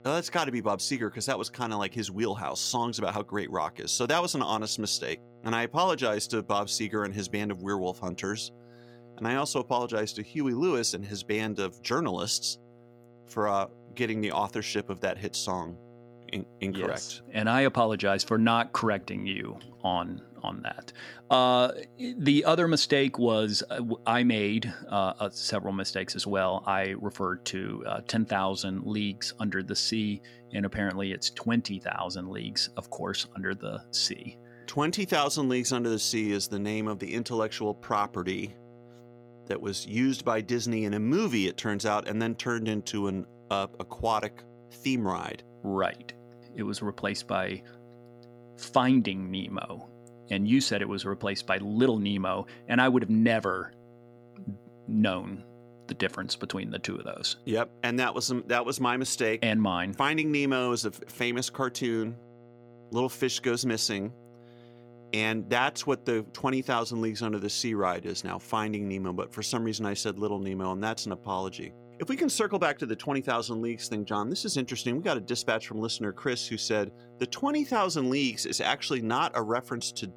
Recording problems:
electrical hum; faint; throughout; 60 Hz, 25 dB below the speech

